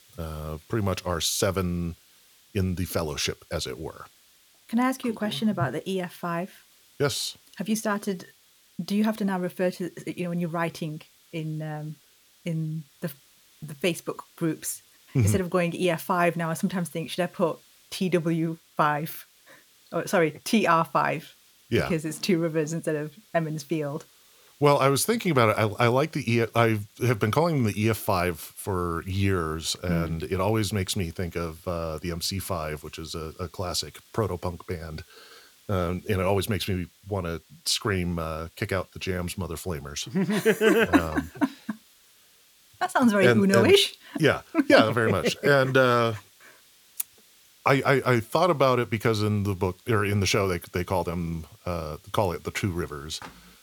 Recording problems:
hiss; faint; throughout; 30 dB below the speech

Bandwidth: 18.5 kHz